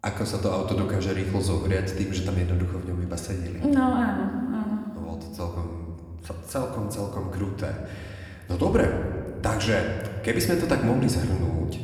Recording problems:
room echo; slight; dies away in 1.6 s
off-mic speech; somewhat distant

